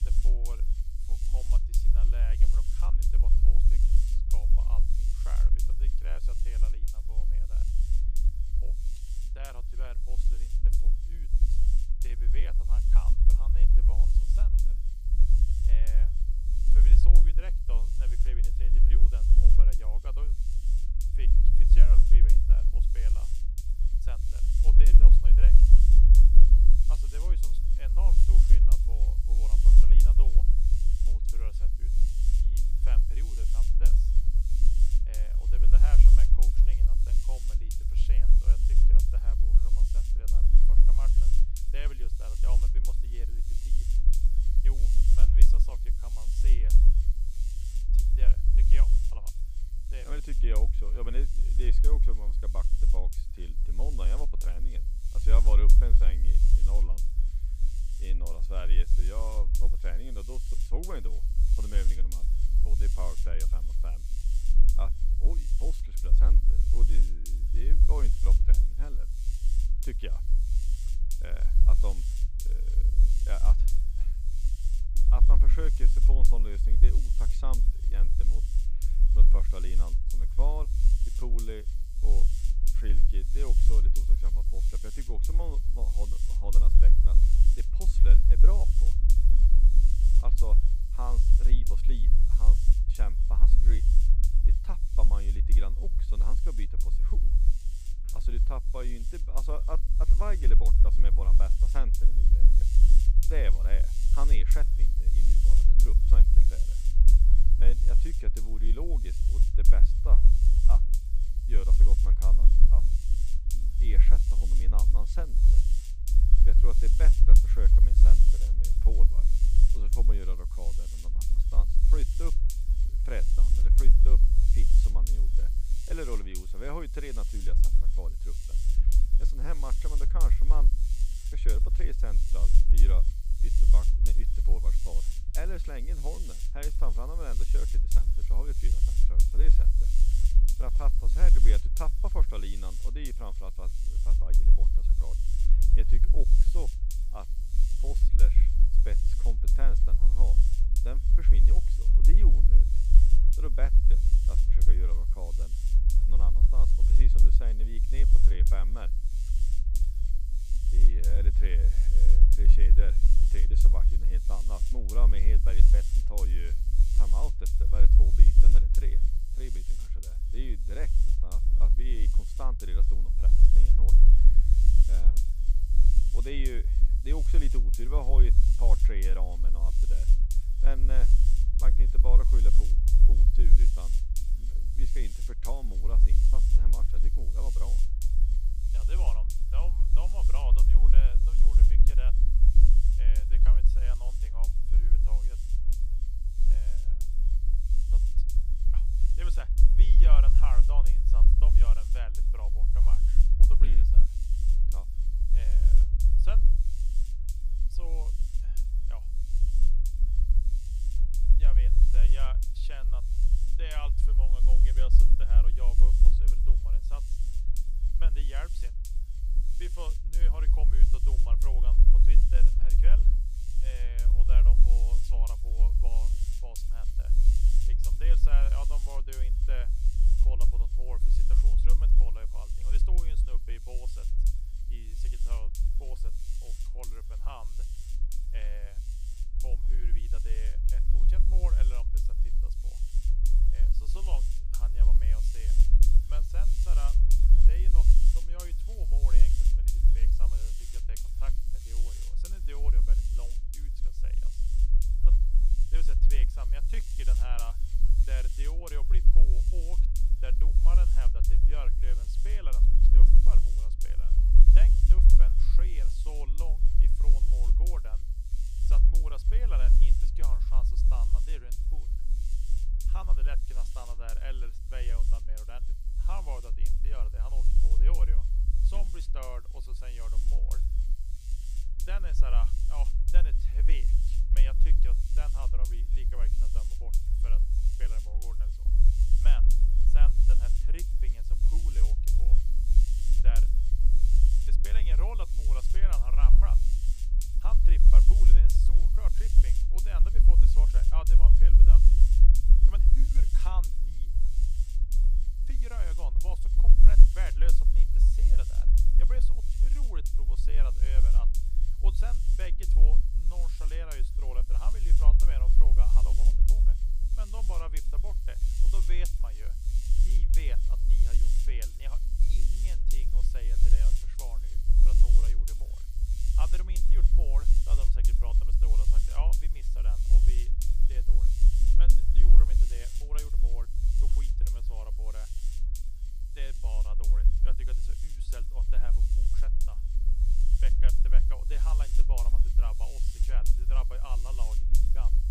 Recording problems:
electrical hum; loud; throughout; 50 Hz, 6 dB below the speech
low rumble; loud; throughout; 5 dB below the speech

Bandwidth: 15 kHz